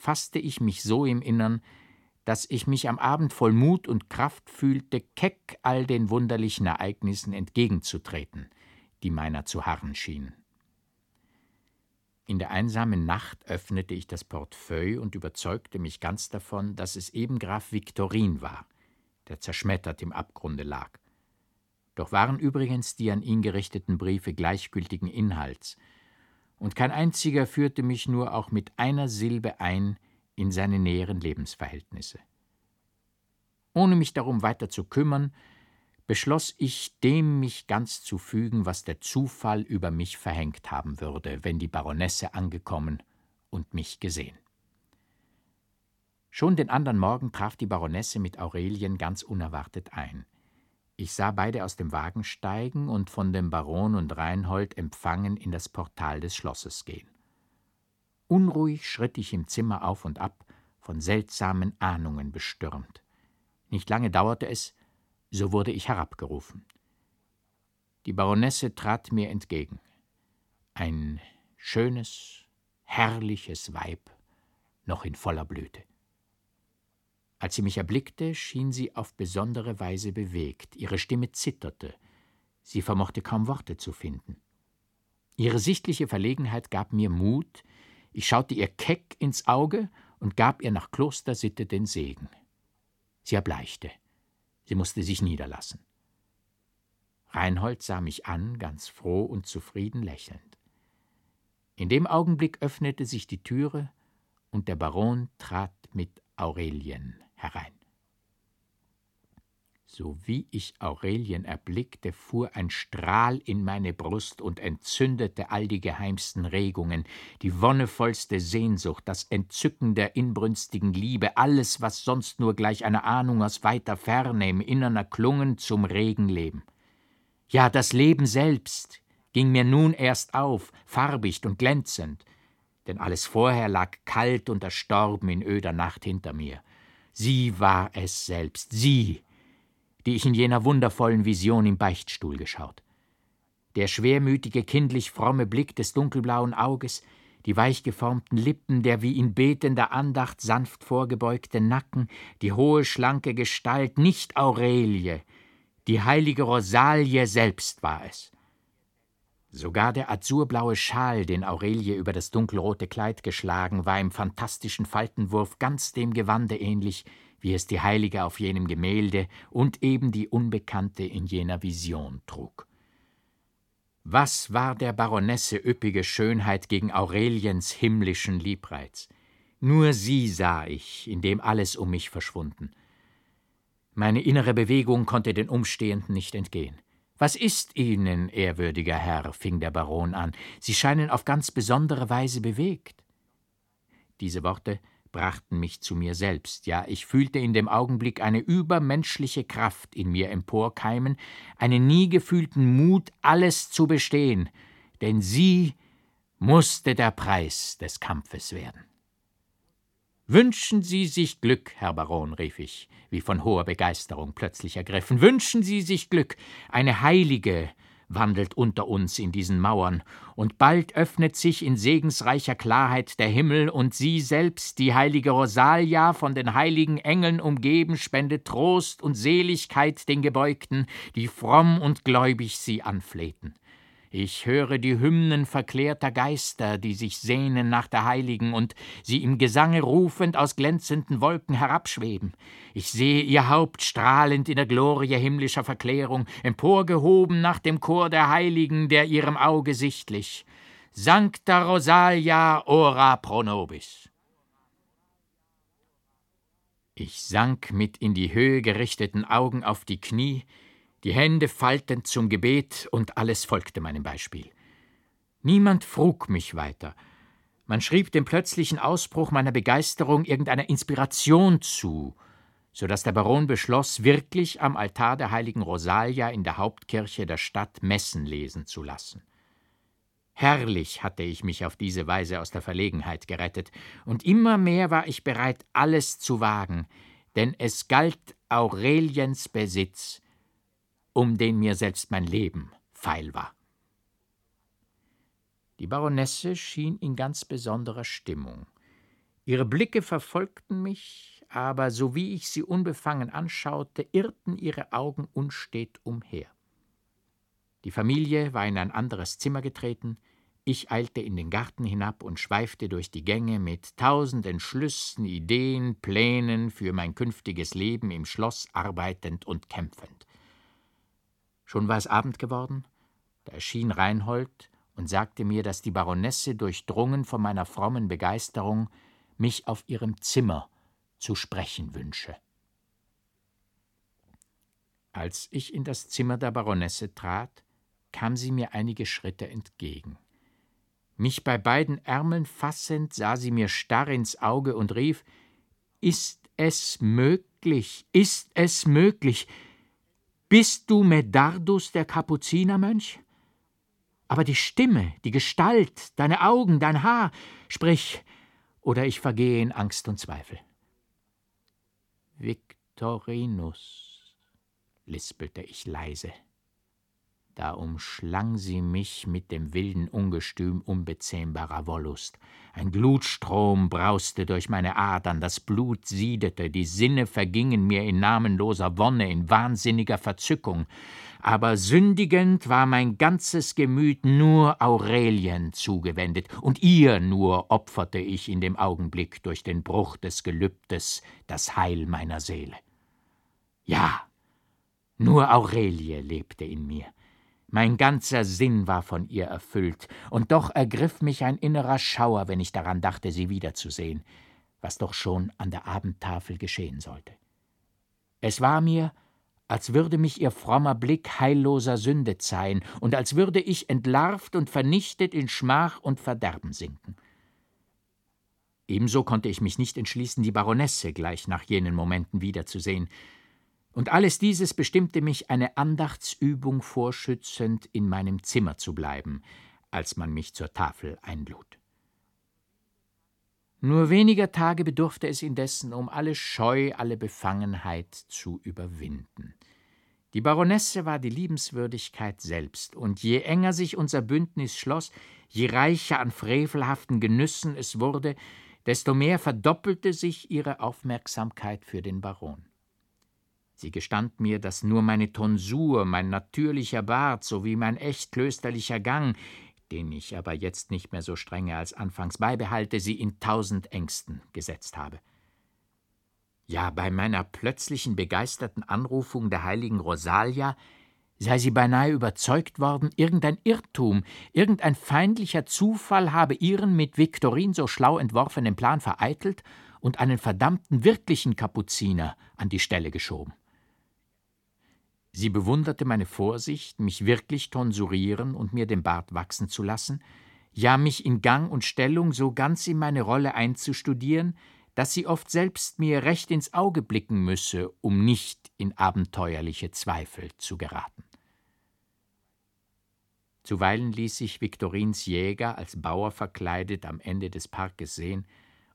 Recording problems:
none

